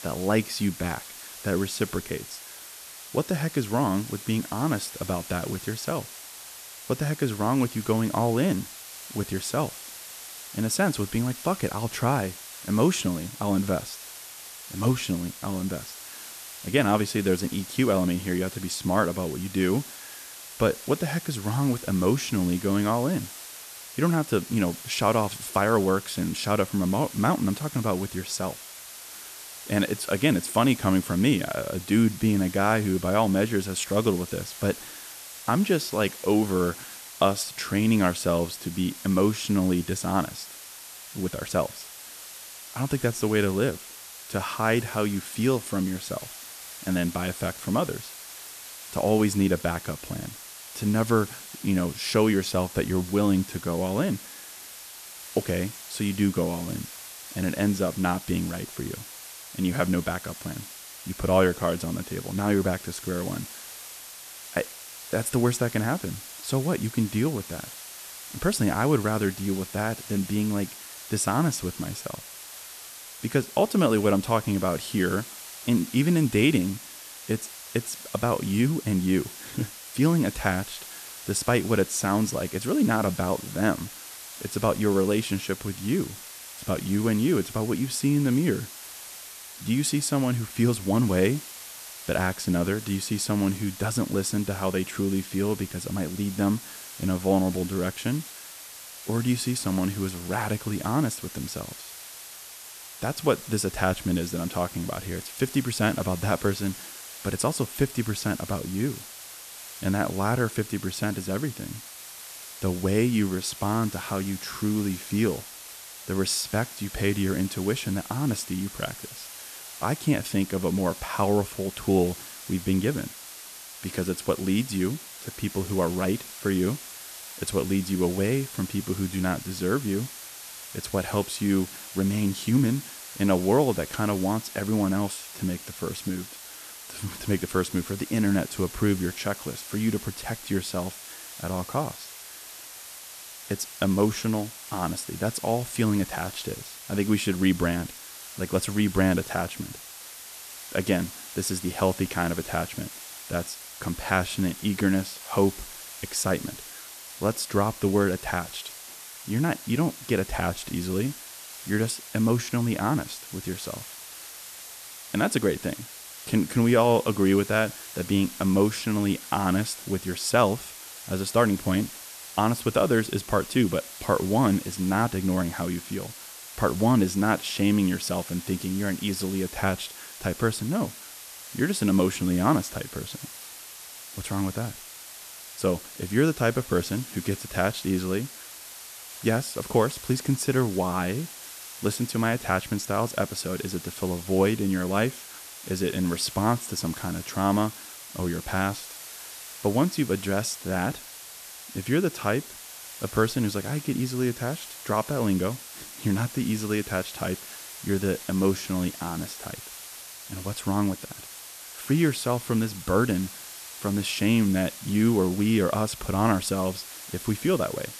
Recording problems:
hiss; noticeable; throughout; 10 dB below the speech

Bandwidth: 14 kHz